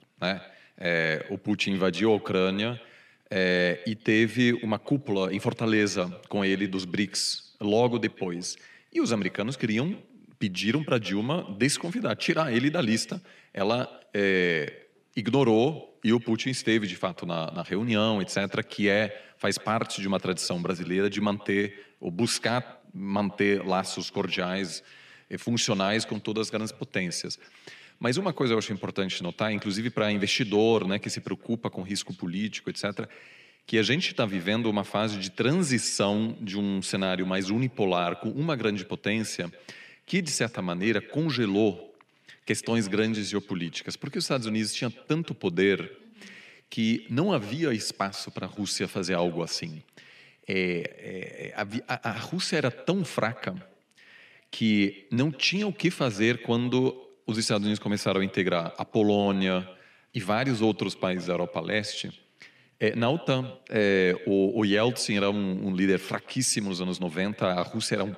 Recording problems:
echo of what is said; faint; throughout; 140 ms later, 20 dB below the speech

